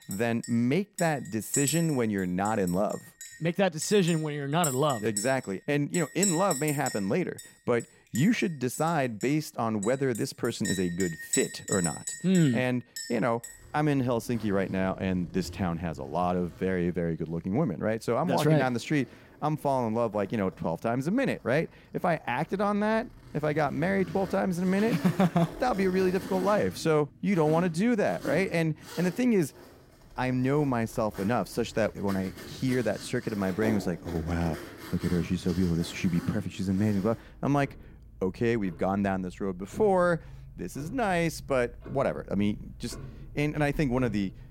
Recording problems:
household noises; noticeable; throughout; 10 dB below the speech

